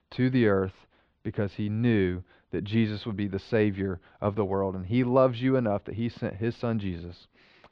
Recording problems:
muffled; very slightly; fading above 3.5 kHz

